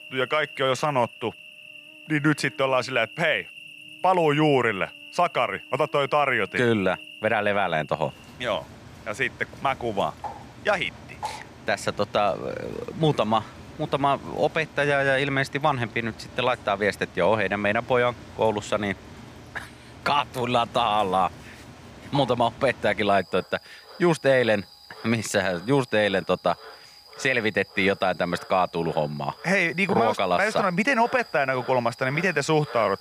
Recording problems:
animal sounds; noticeable; throughout; 20 dB below the speech

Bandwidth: 15 kHz